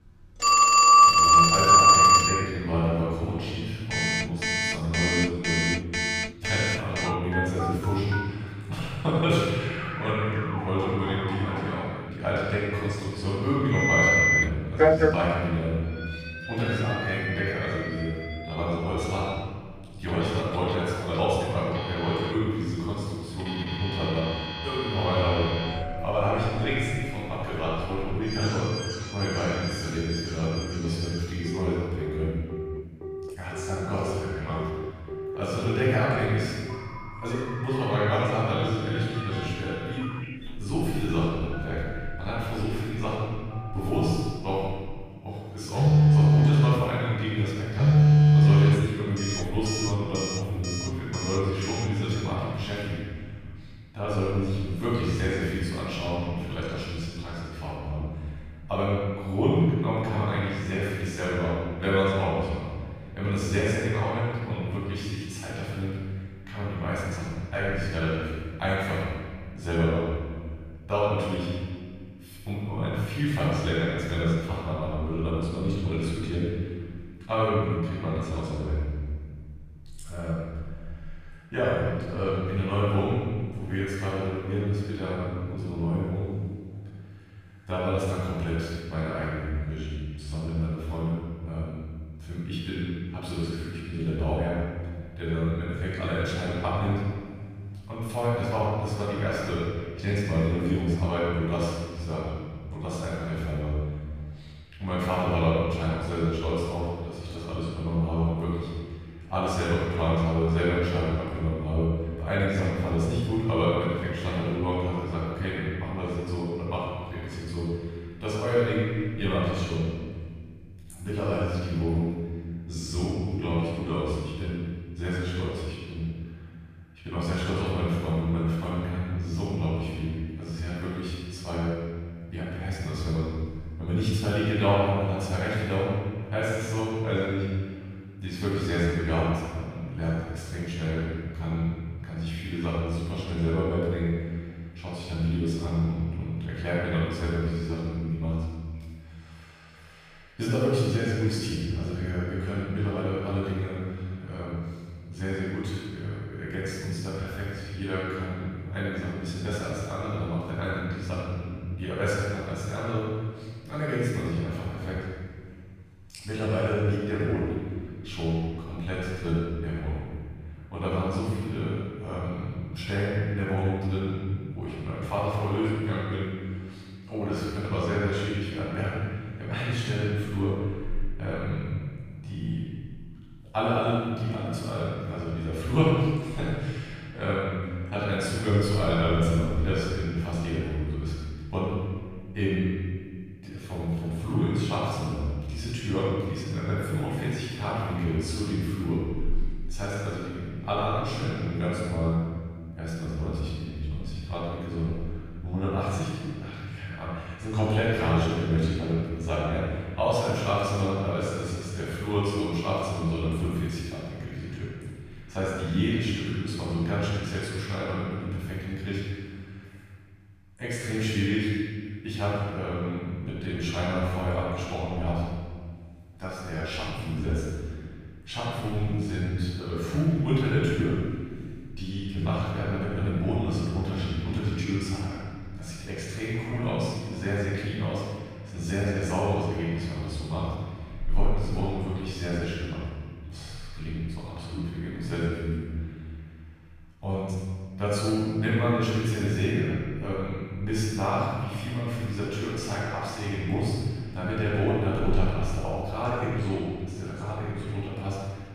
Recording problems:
room echo; strong; dies away in 1.8 s
off-mic speech; far
alarms or sirens; very loud; until 52 s; 7 dB above the speech

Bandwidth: 14.5 kHz